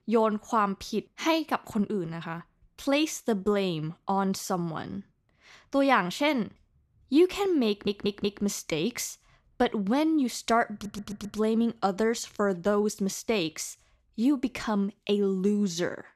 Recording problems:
audio stuttering; at 7.5 s and at 11 s

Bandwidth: 14 kHz